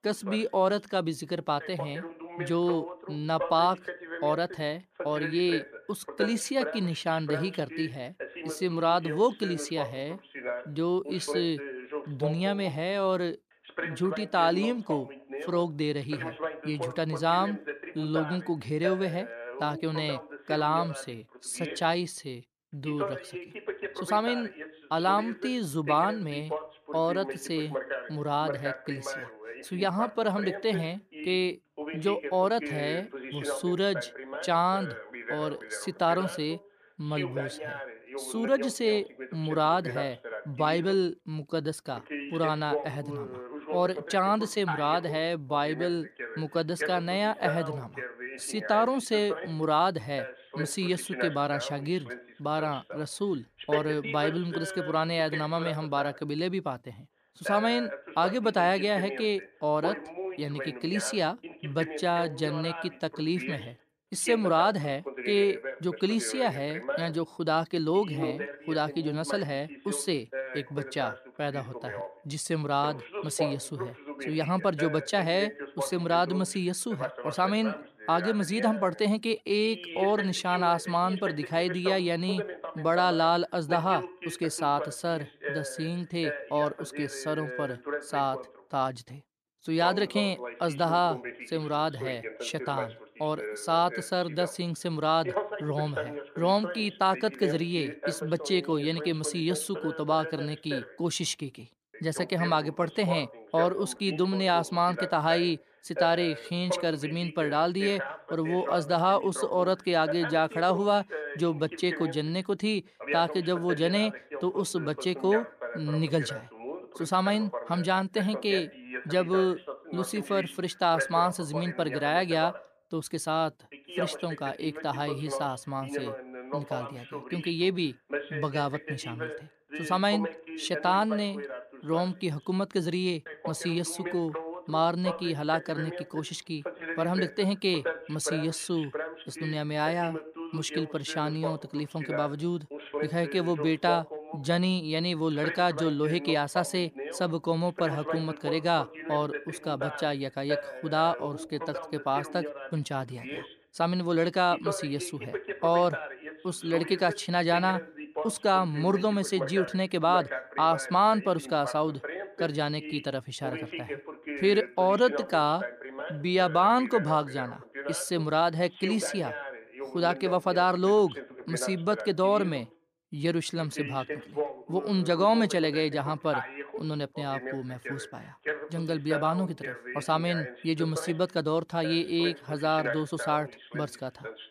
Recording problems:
voice in the background; loud; throughout; 9 dB below the speech

